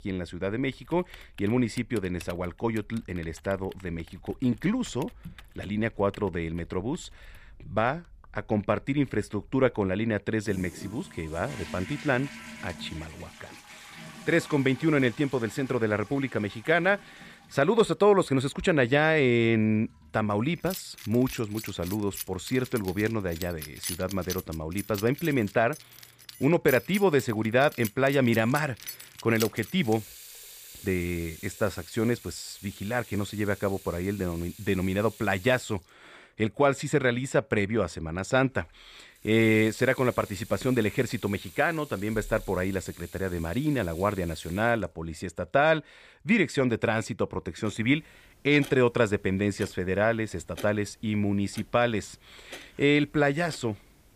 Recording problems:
household noises; noticeable; throughout; 15 dB below the speech

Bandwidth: 15 kHz